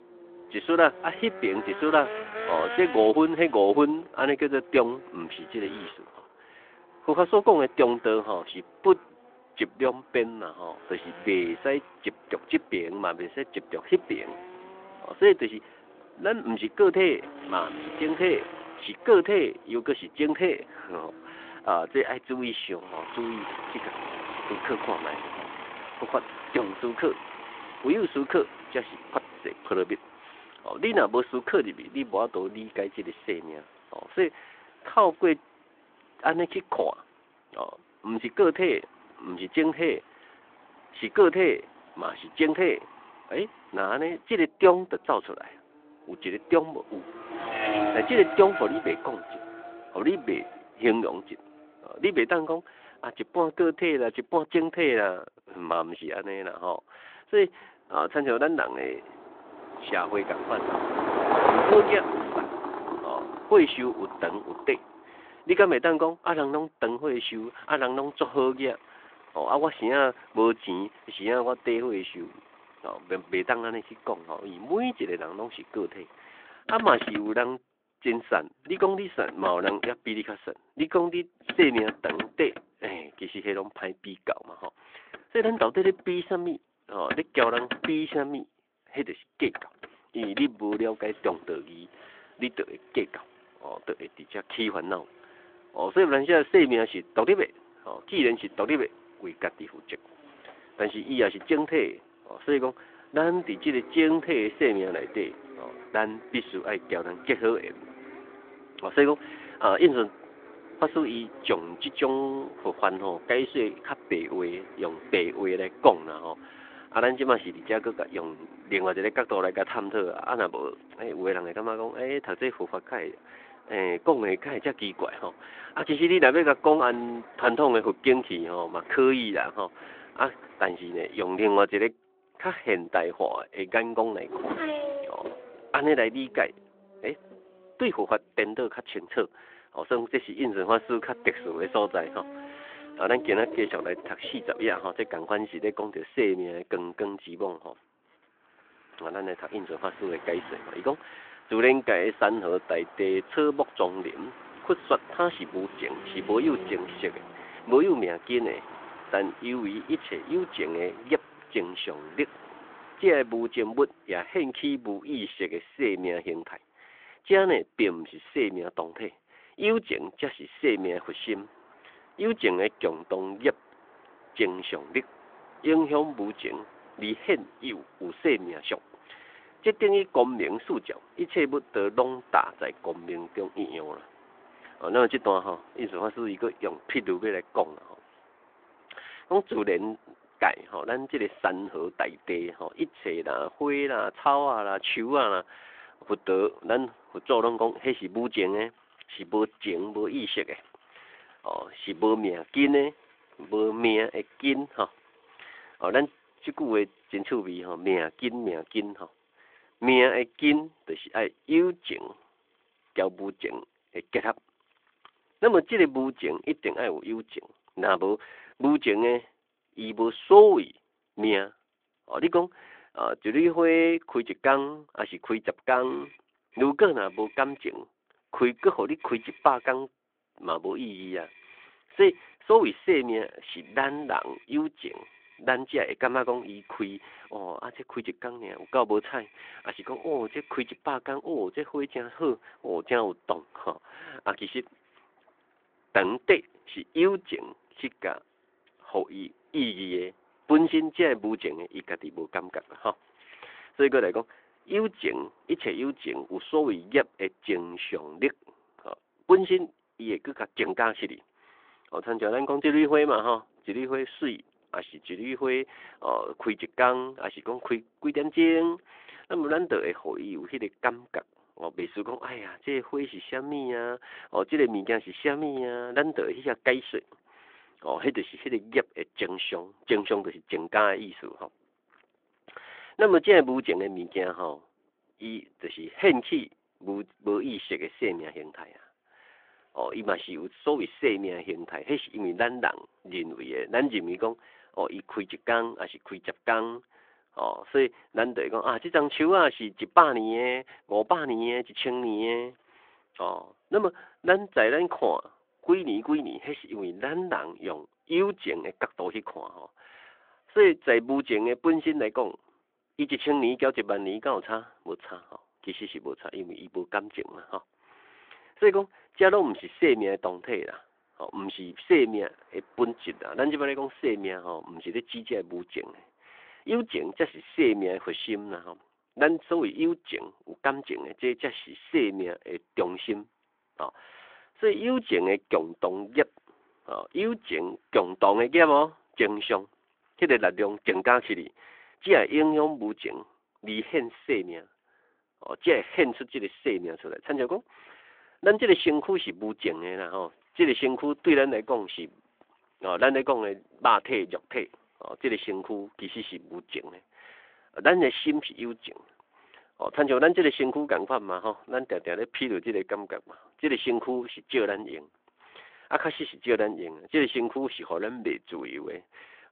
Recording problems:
phone-call audio
traffic noise; noticeable; throughout; 10 dB below the speech

